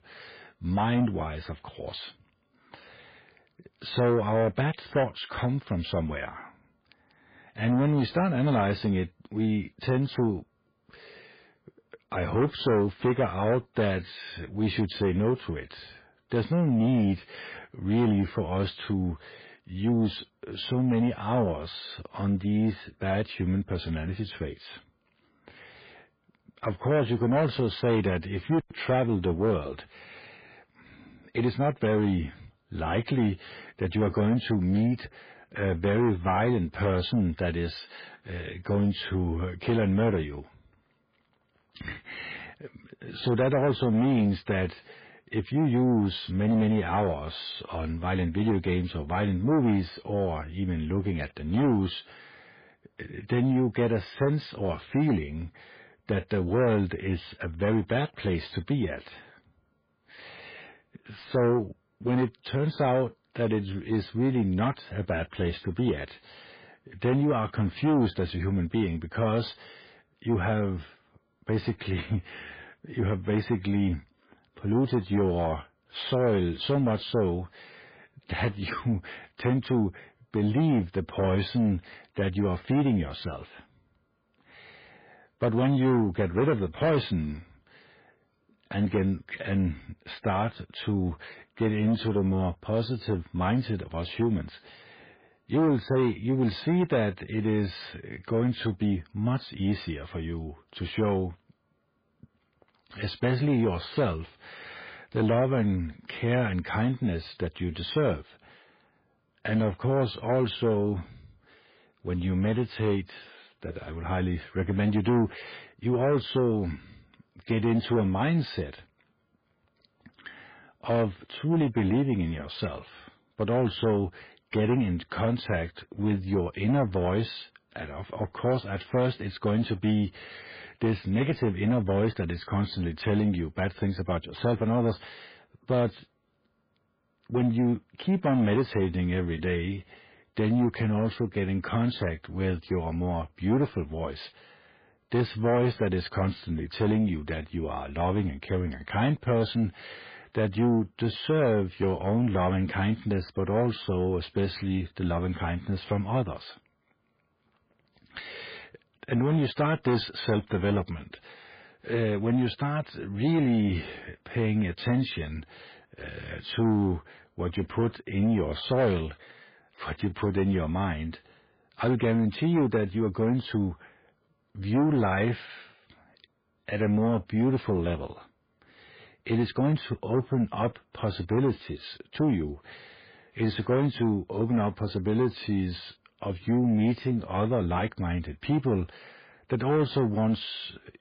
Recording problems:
garbled, watery; badly; nothing above 5 kHz
distortion; slight; 10 dB below the speech

